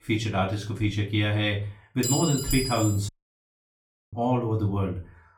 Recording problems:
off-mic speech; far
room echo; slight; dies away in 0.3 s
clattering dishes; noticeable; at 2 s; peak 1 dB below the speech
audio cutting out; at 3 s for 1 s

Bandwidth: 17.5 kHz